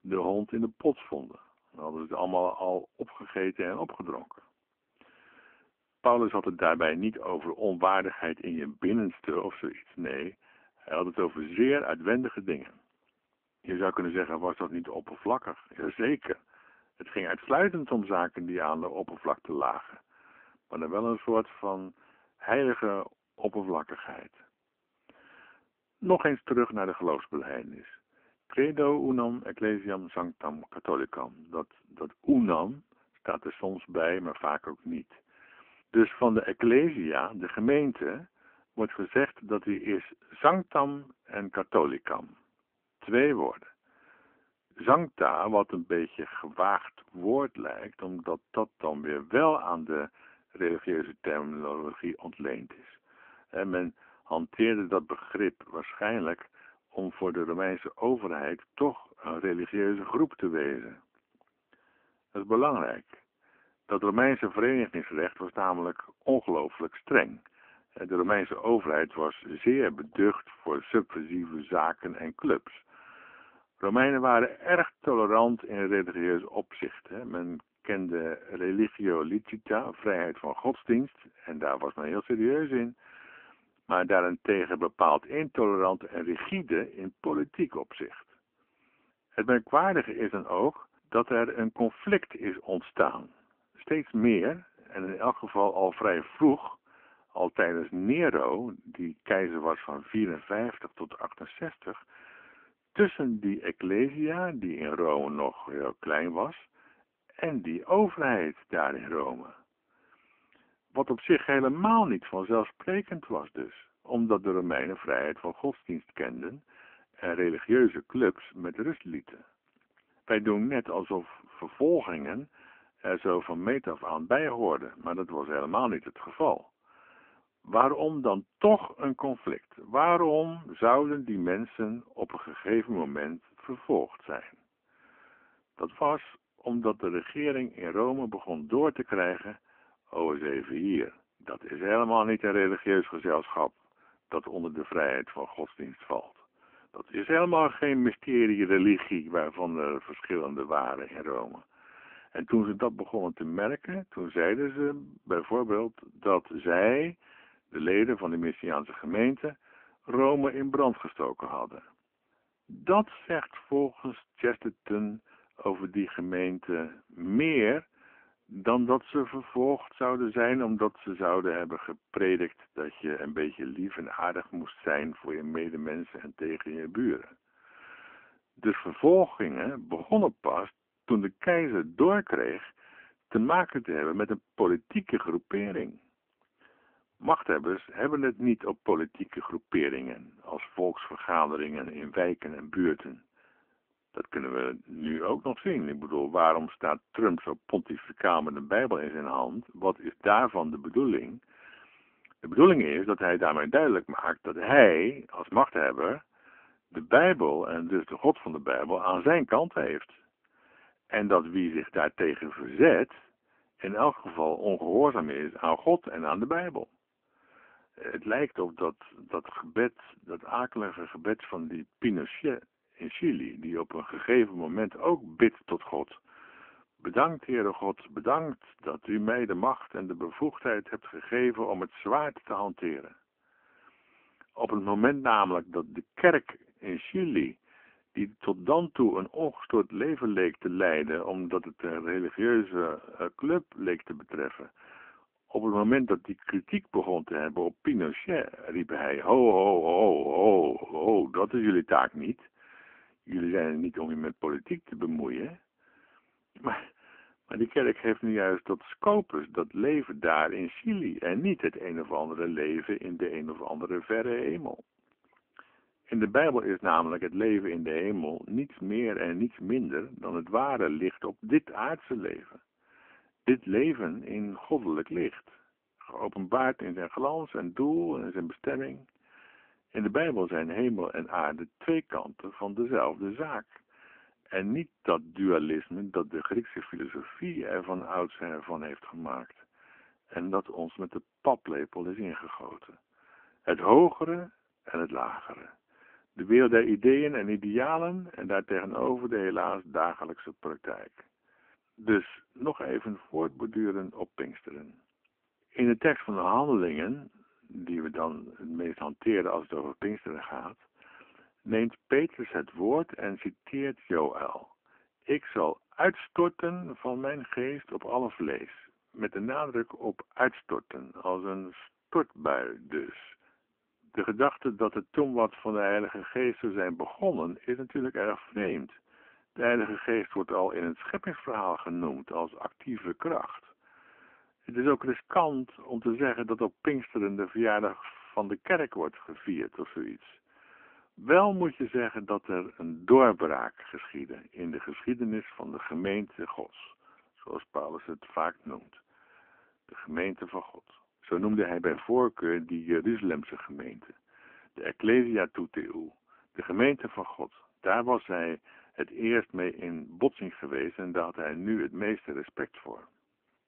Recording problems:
phone-call audio; poor line

